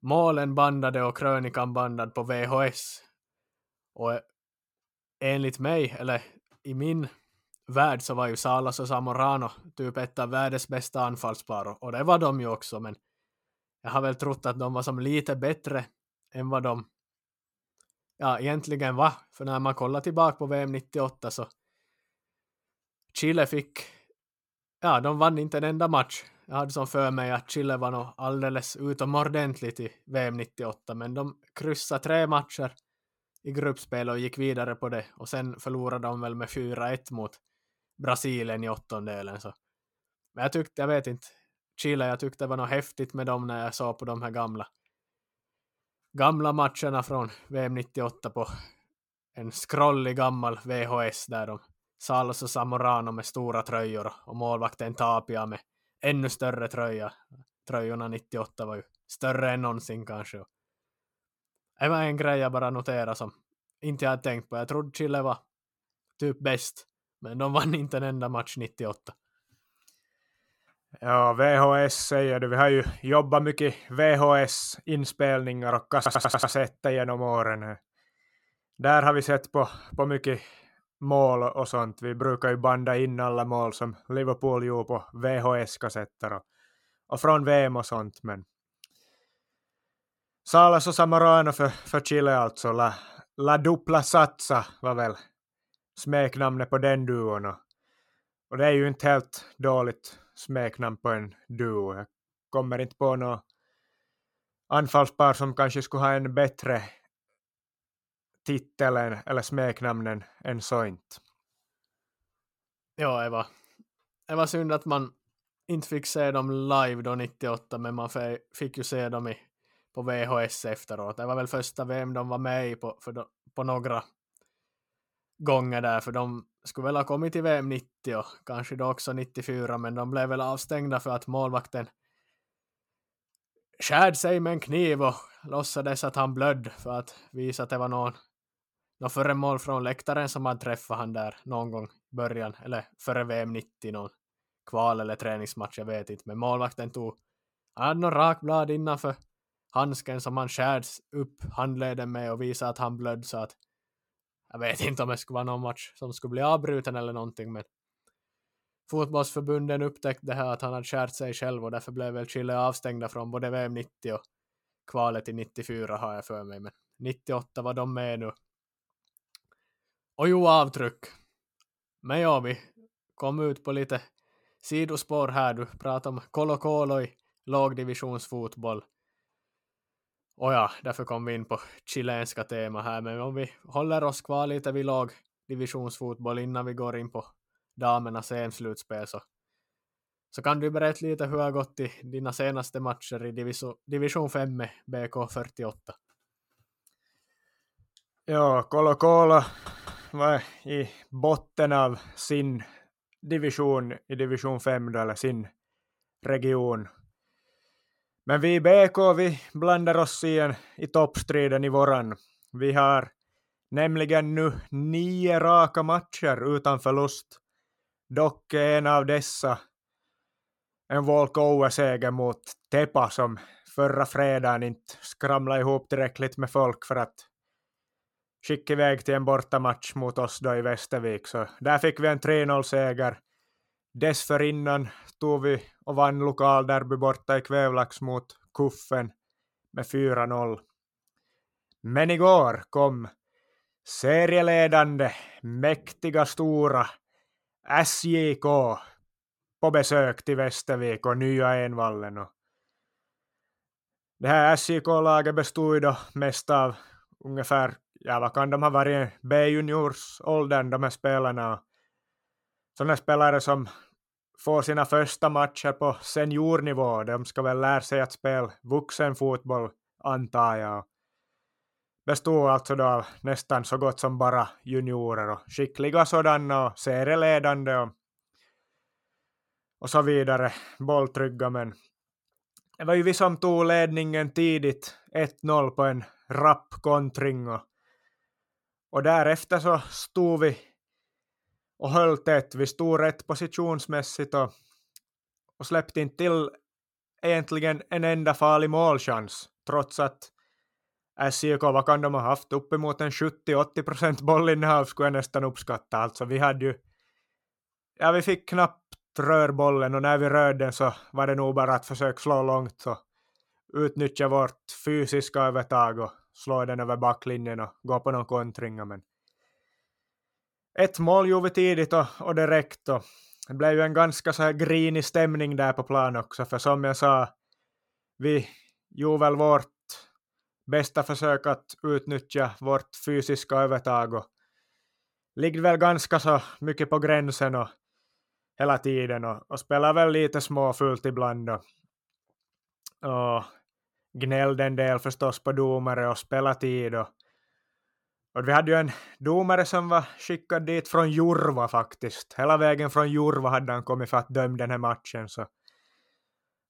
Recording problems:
audio stuttering; at 1:16 and at 3:19

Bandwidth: 17 kHz